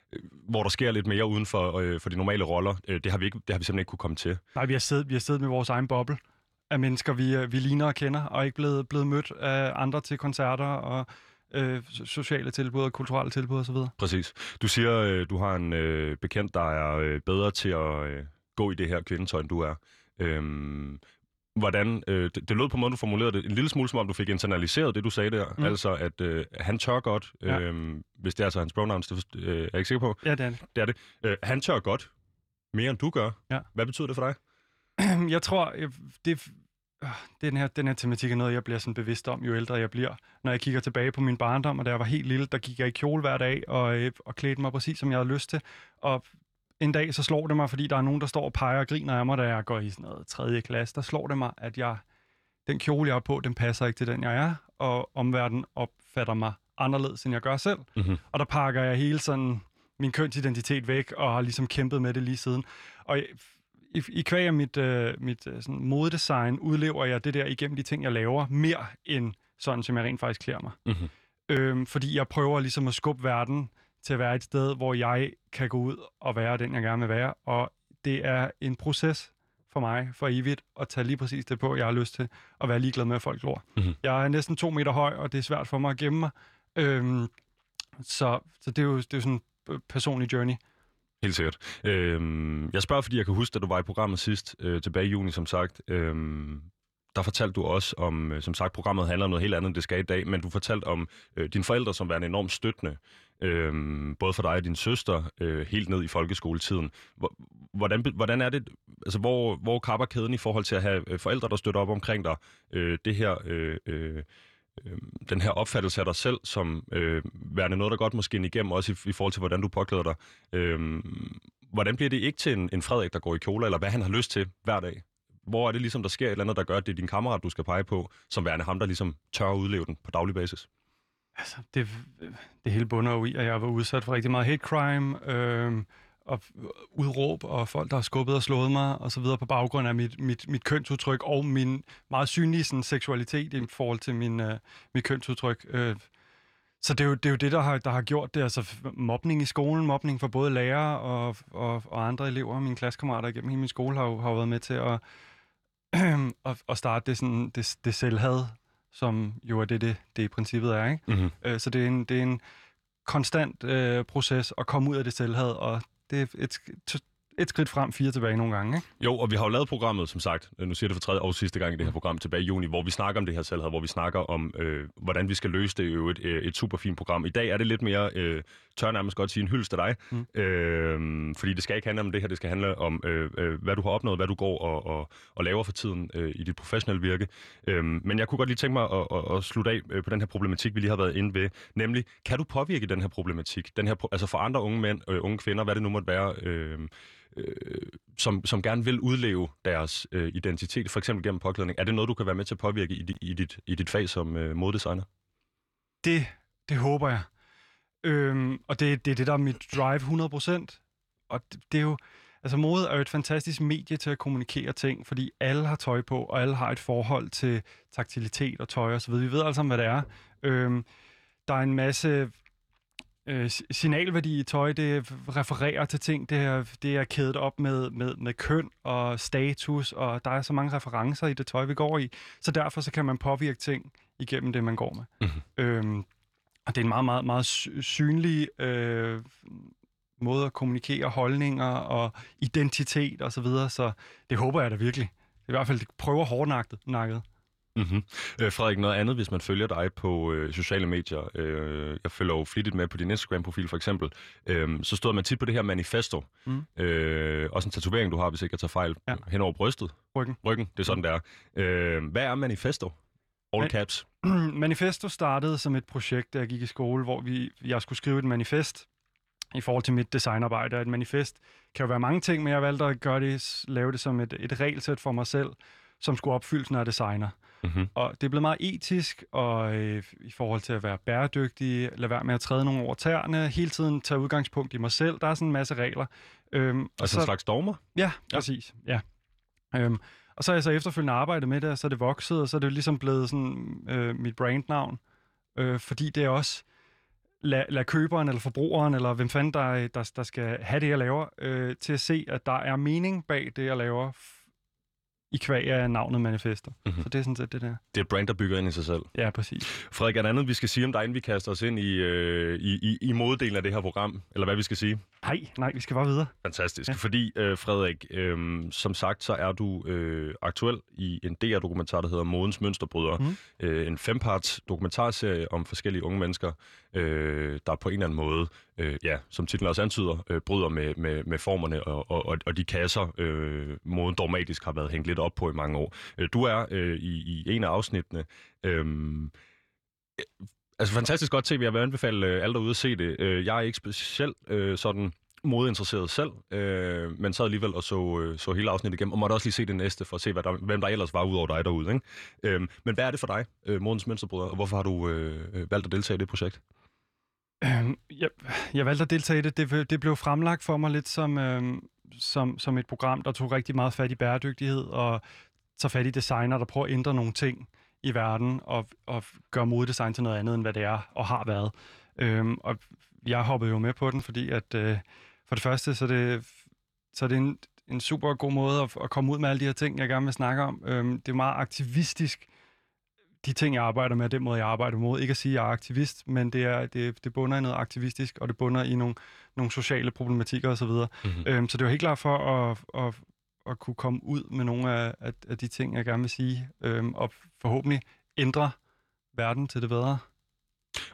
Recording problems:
none

